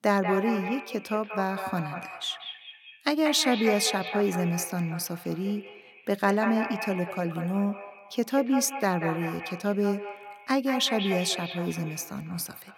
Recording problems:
echo of what is said; strong; throughout; 190 ms later, 8 dB below the speech

